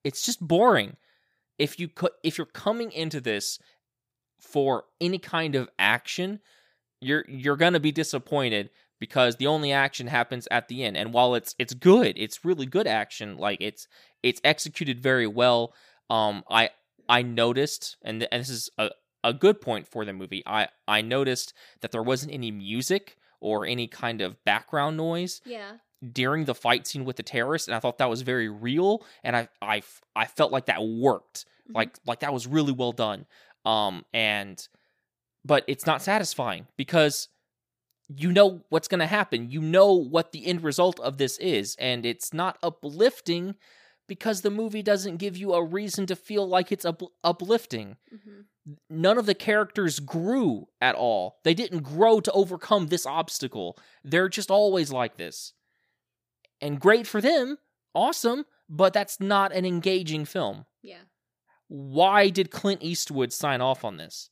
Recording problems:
none

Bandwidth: 15 kHz